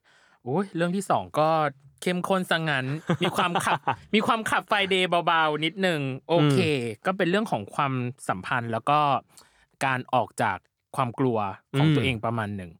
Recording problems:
none

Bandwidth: 18.5 kHz